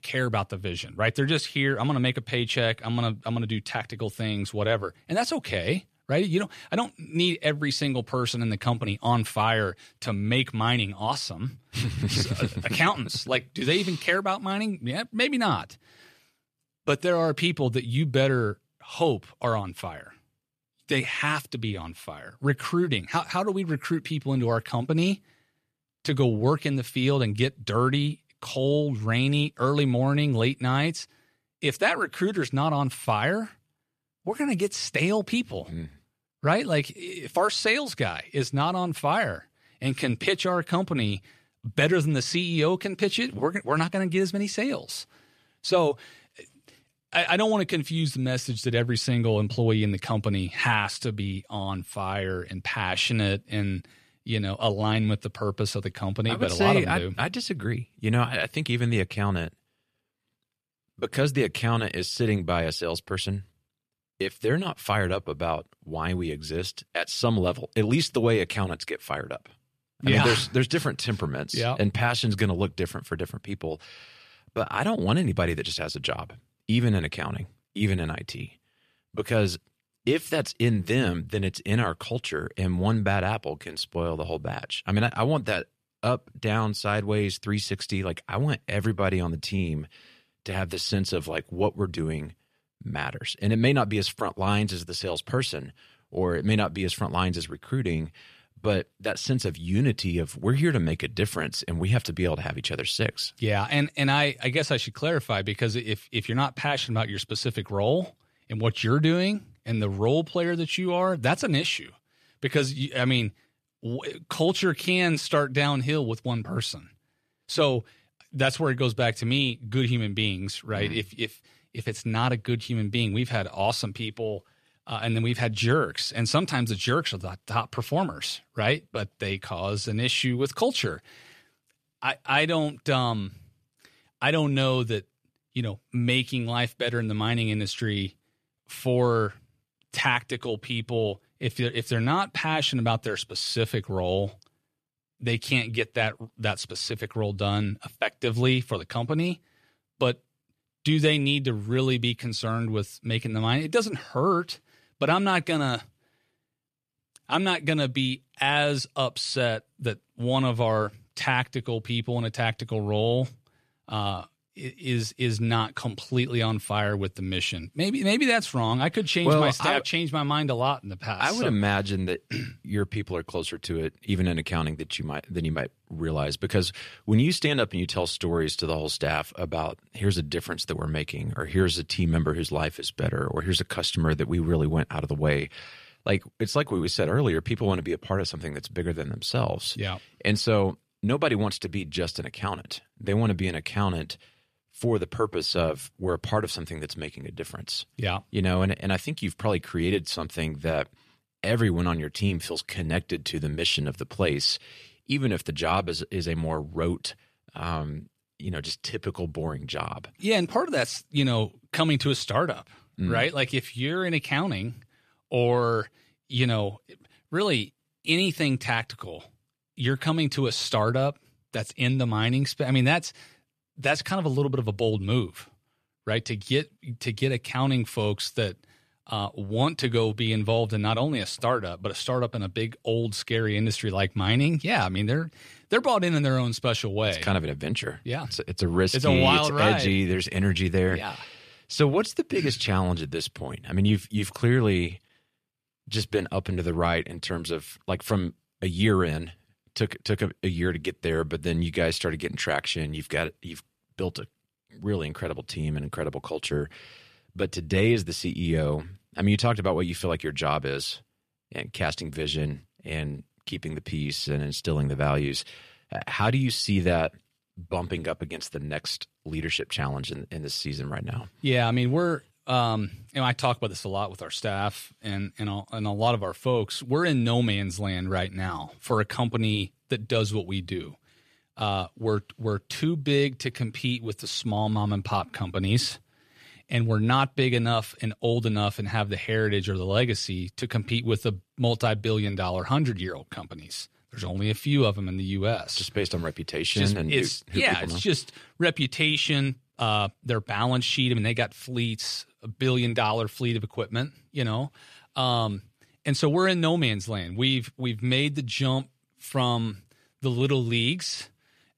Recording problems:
none

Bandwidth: 14.5 kHz